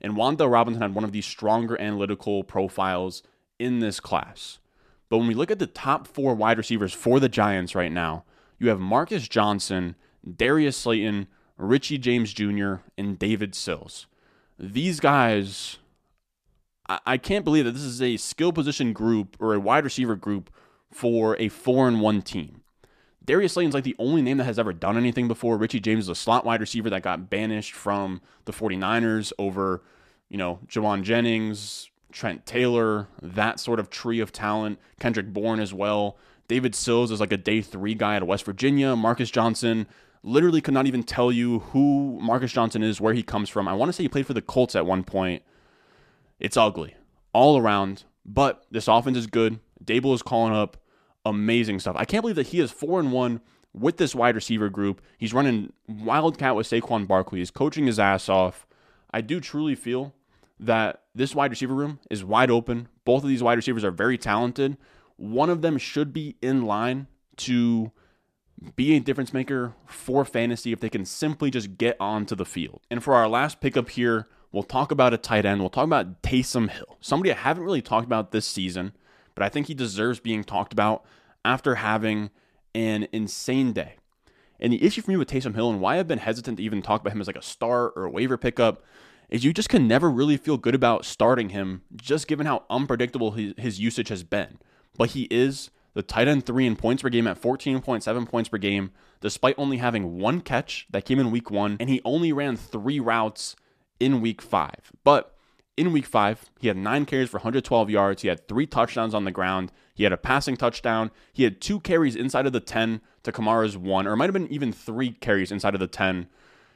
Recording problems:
none

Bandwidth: 14.5 kHz